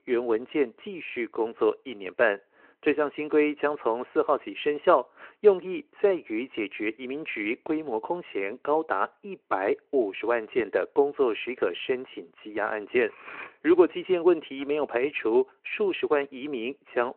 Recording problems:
muffled; very; fading above 2.5 kHz
phone-call audio
clattering dishes; faint; at 13 s; peak 15 dB below the speech

